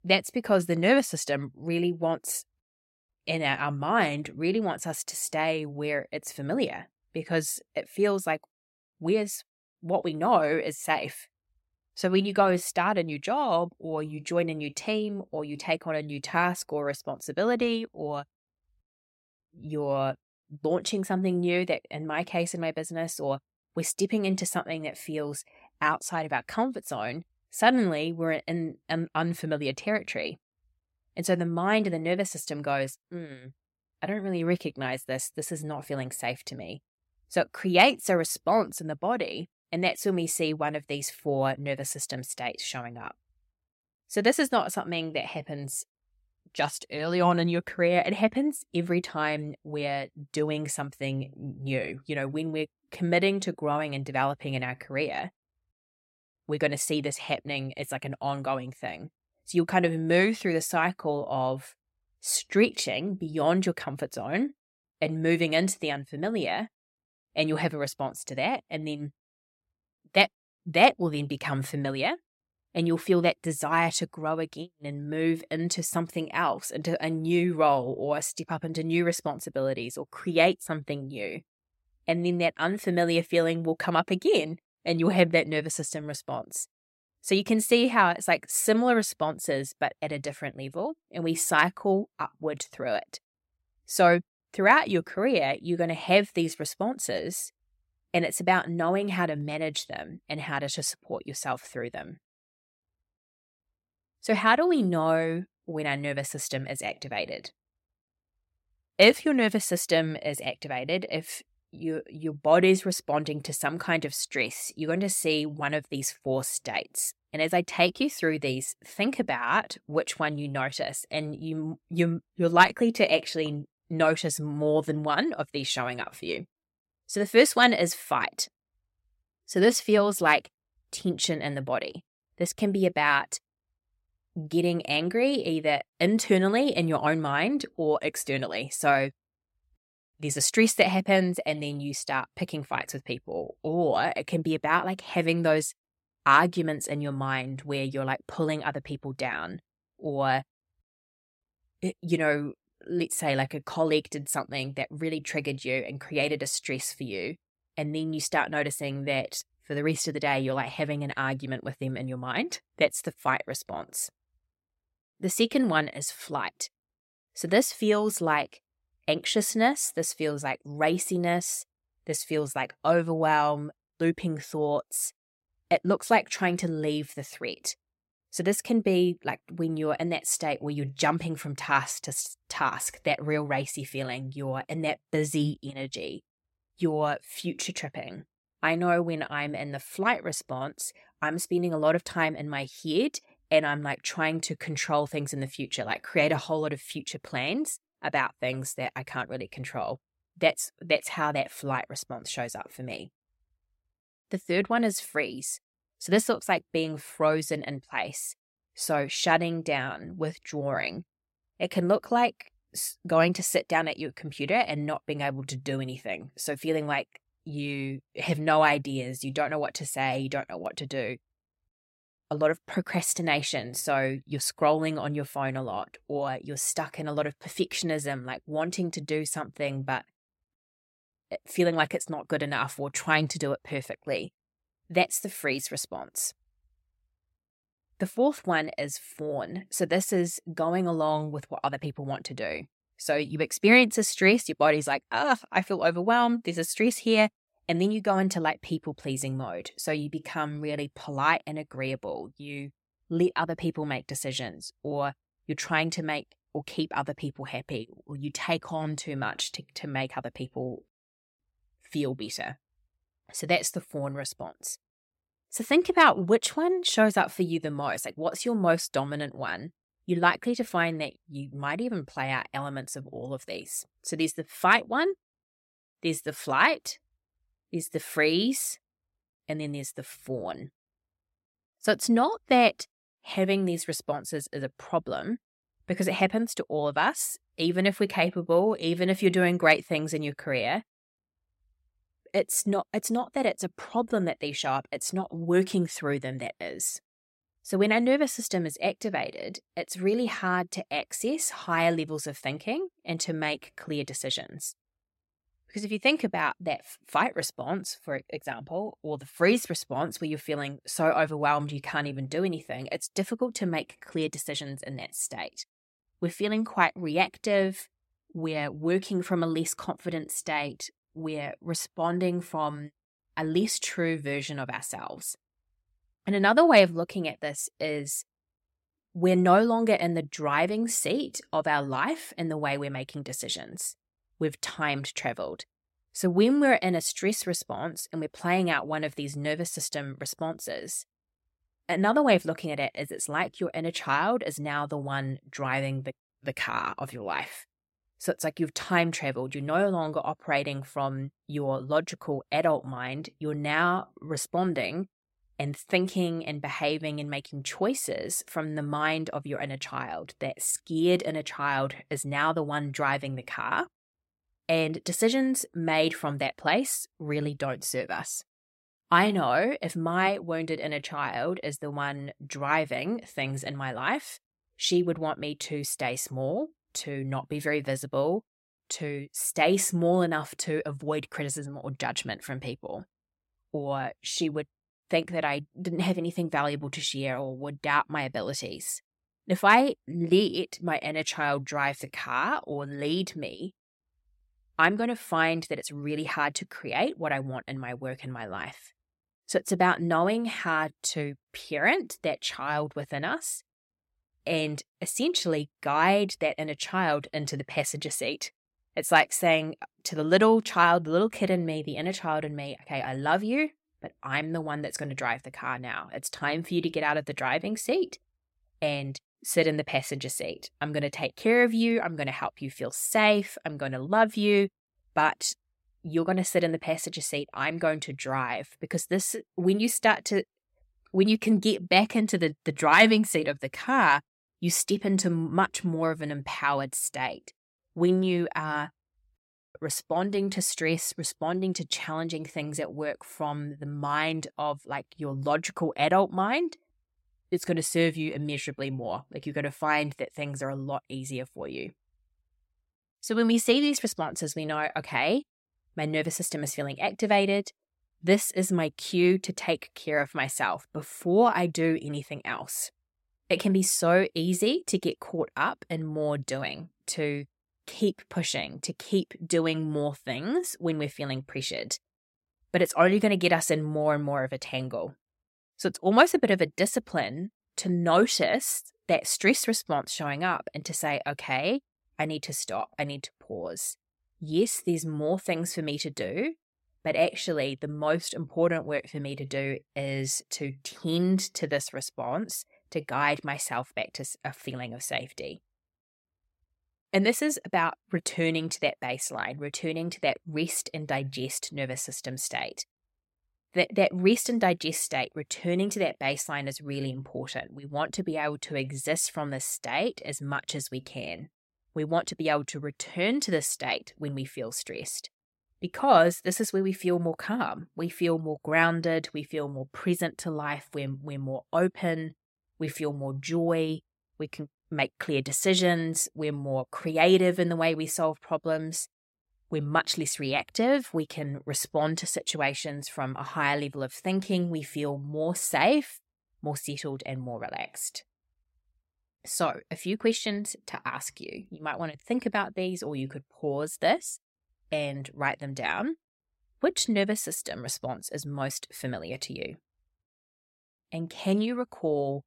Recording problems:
none

